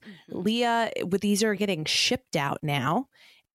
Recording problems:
none

